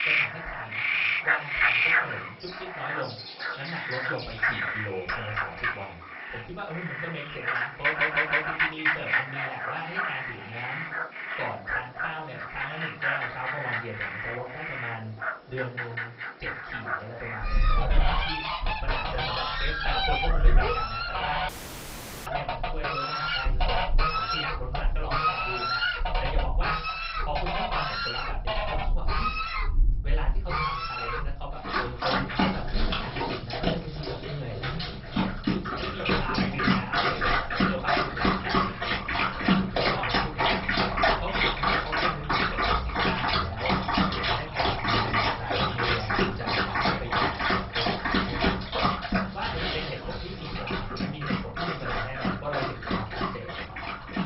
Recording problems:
off-mic speech; far
garbled, watery; badly; nothing above 5.5 kHz
room echo; slight; dies away in 0.3 s
animal sounds; very loud; throughout; 10 dB above the speech
audio stuttering; at 8 s
audio cutting out; at 21 s for 1 s

